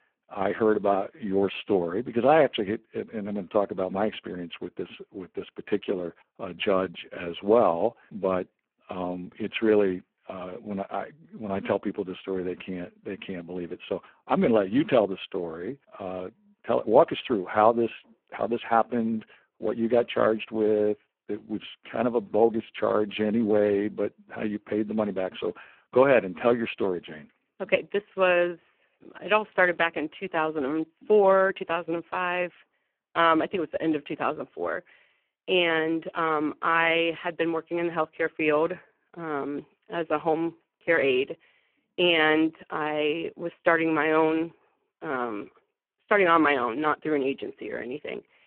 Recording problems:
phone-call audio; poor line

